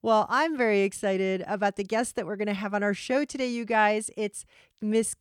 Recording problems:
none

